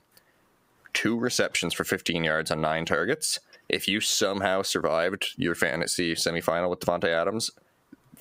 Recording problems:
squashed, flat; heavily

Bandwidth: 15.5 kHz